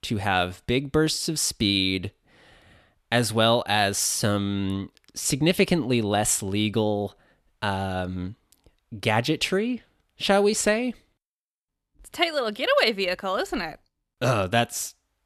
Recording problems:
none

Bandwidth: 13.5 kHz